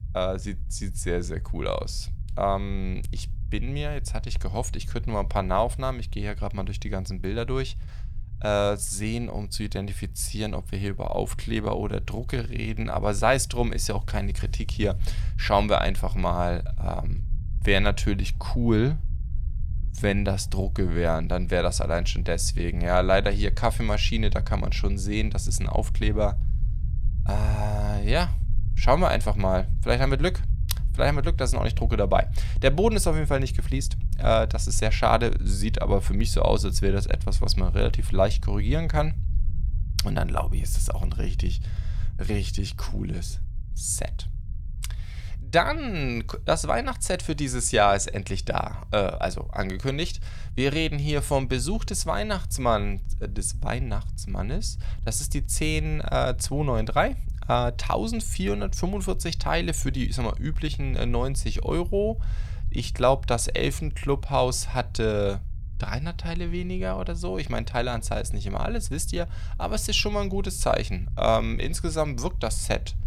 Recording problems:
low rumble; faint; throughout; 25 dB below the speech

